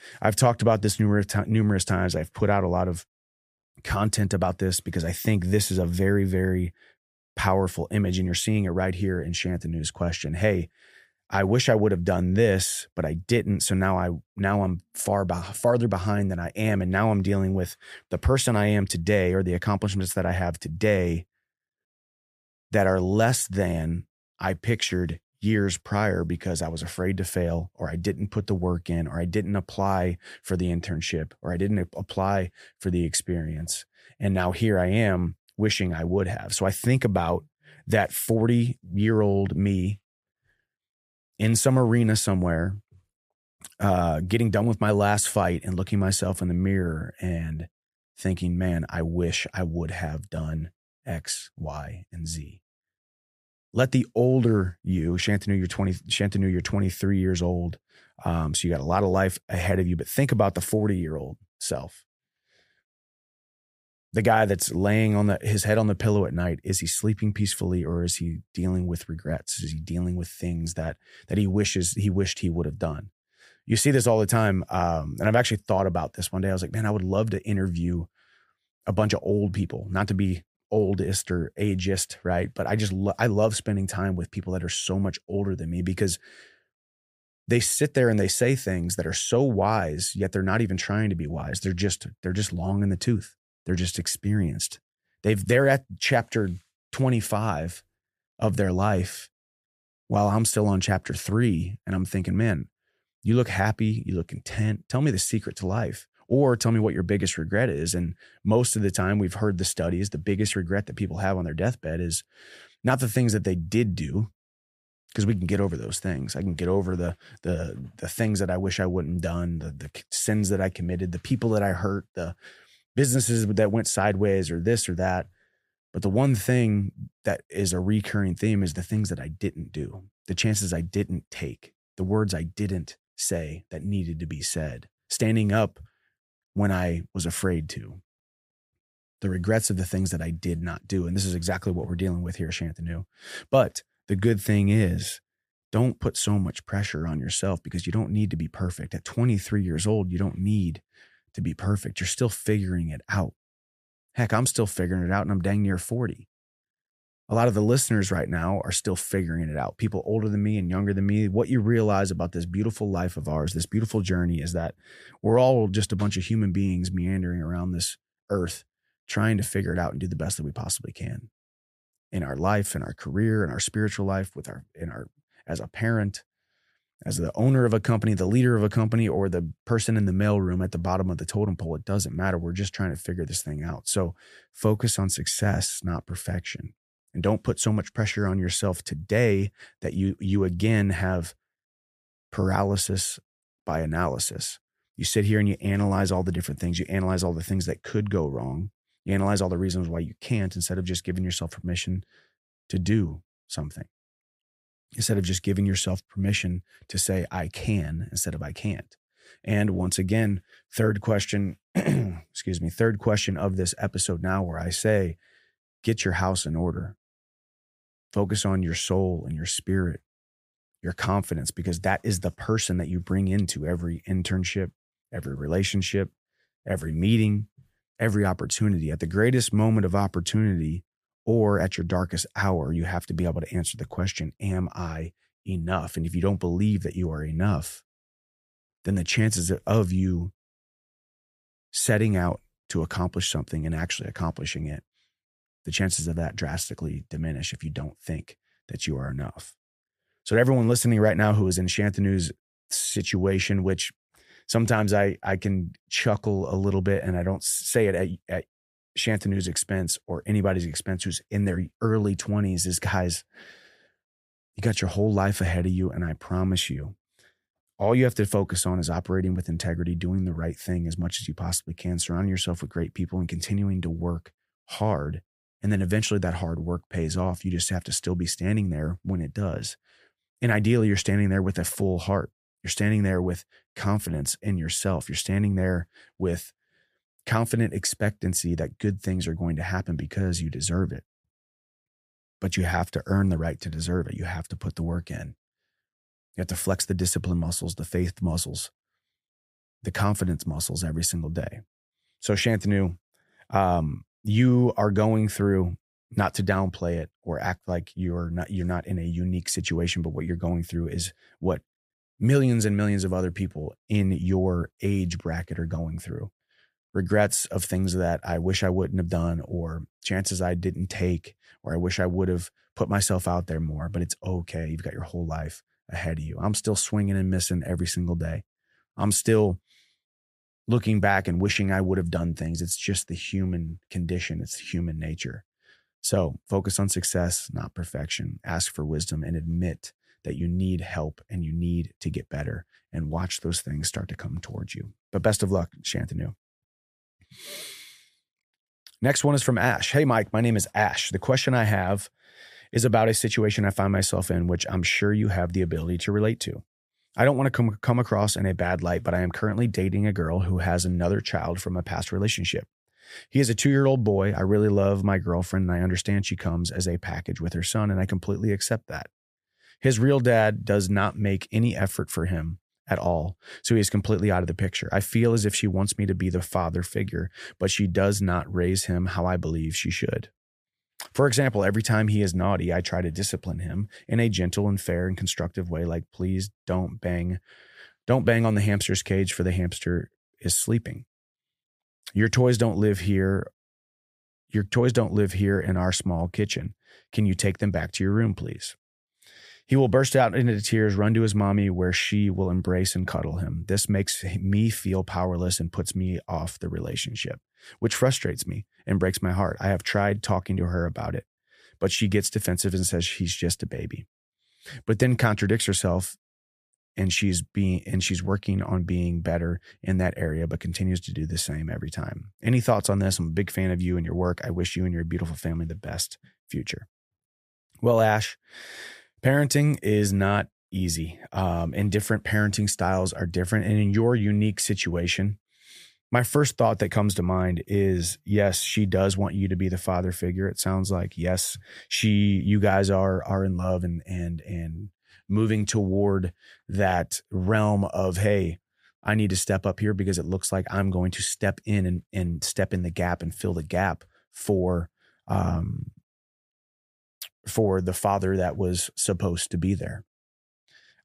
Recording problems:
none

